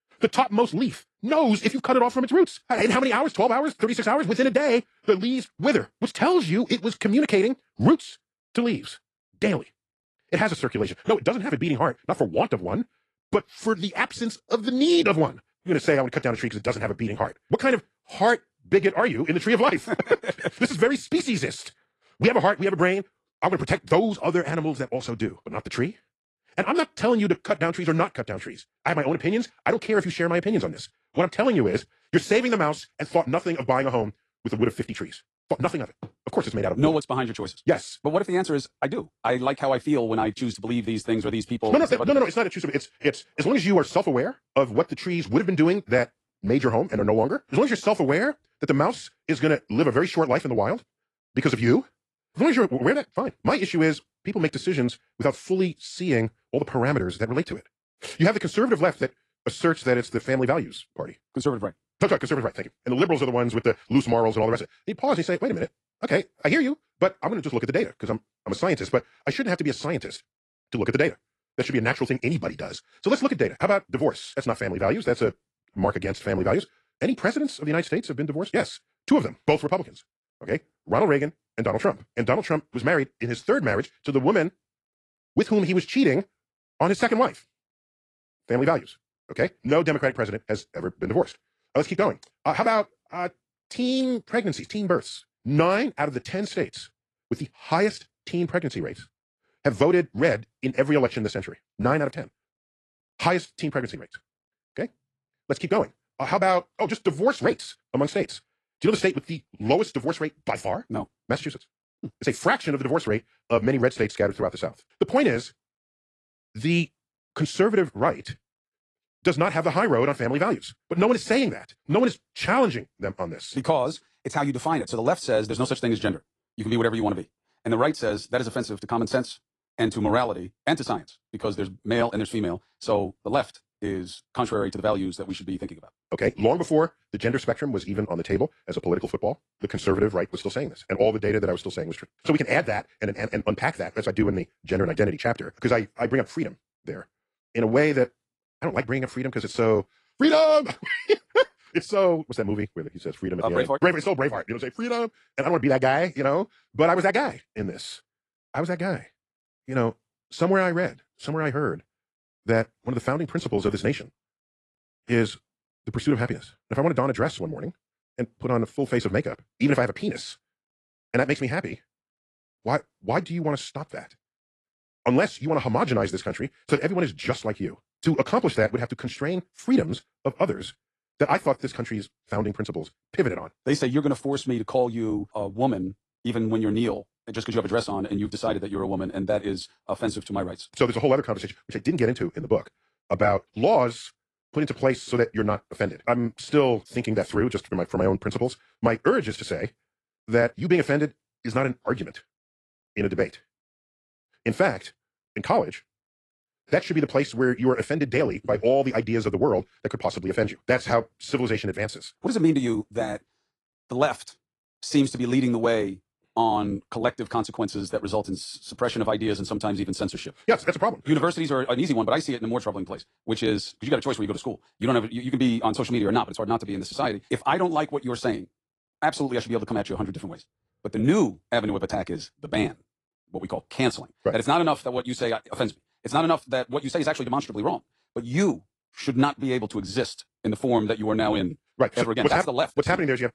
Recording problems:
wrong speed, natural pitch; too fast; 1.6 times normal speed
garbled, watery; slightly

